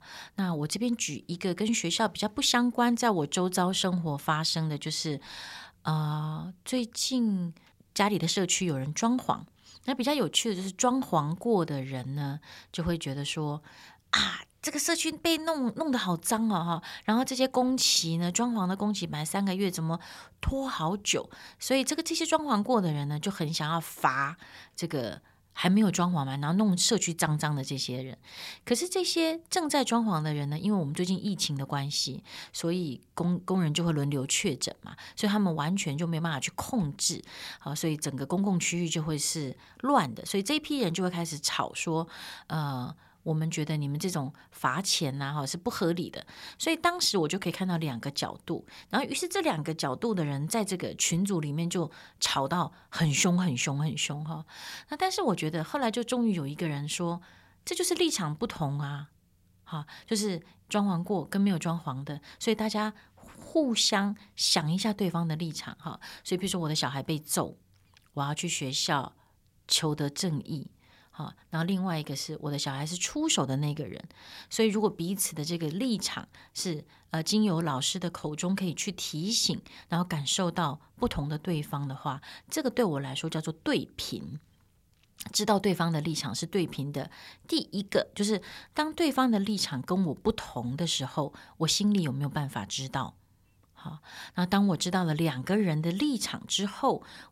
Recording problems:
none

